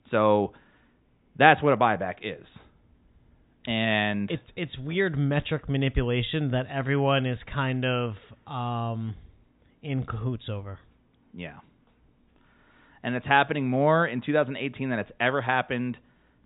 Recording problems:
high frequencies cut off; severe; nothing above 4 kHz

